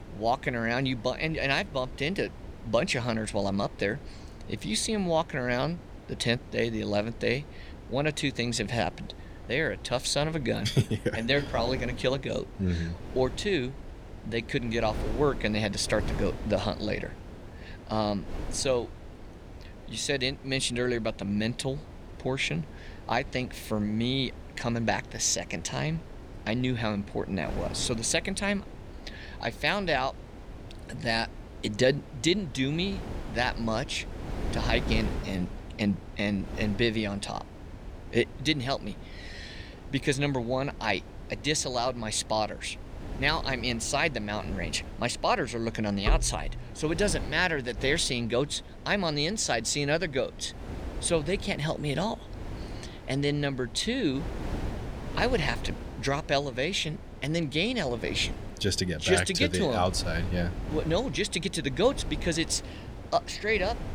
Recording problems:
wind noise on the microphone; occasional gusts; 15 dB below the speech

